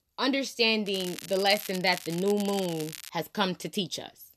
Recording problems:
crackling; noticeable; from 1 to 3 s; 10 dB below the speech

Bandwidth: 13.5 kHz